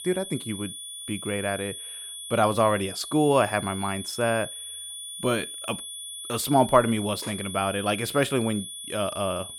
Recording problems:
high-pitched whine; loud; throughout; 3.5 kHz, 9 dB below the speech

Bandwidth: 17 kHz